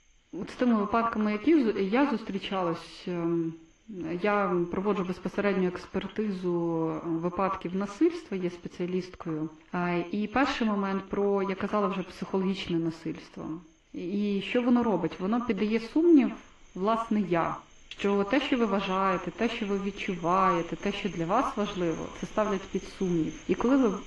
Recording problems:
echo of what is said; strong; throughout; 80 ms later, 10 dB below the speech
muffled; slightly; fading above 2.5 kHz
garbled, watery; slightly; nothing above 15.5 kHz
animal sounds; faint; throughout; 25 dB below the speech

